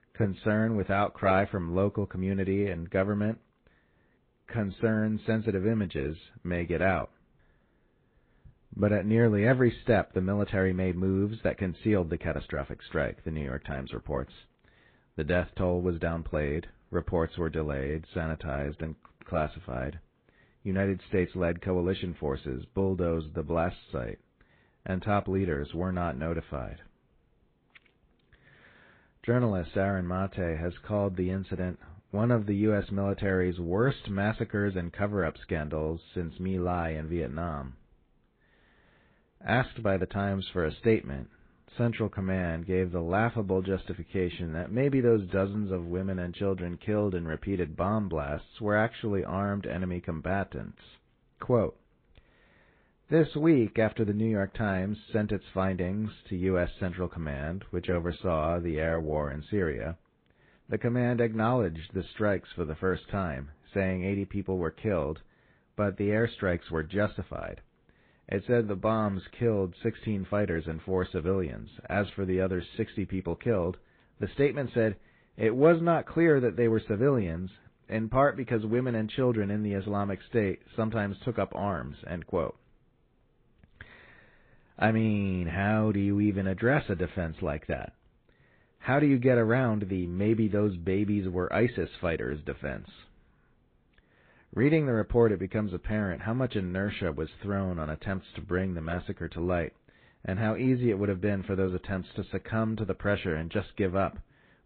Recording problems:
high frequencies cut off; severe; nothing above 4 kHz
garbled, watery; slightly

